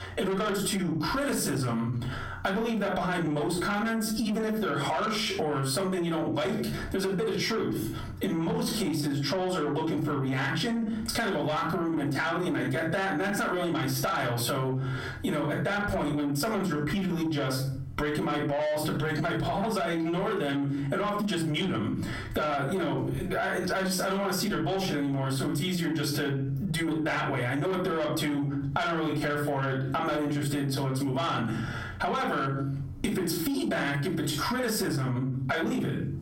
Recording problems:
off-mic speech; far
room echo; slight; dies away in 0.4 s
distortion; slight; 10 dB below the speech
squashed, flat; somewhat

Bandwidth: 16 kHz